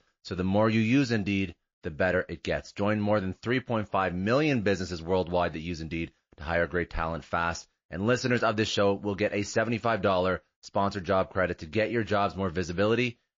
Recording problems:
garbled, watery; slightly; nothing above 6 kHz

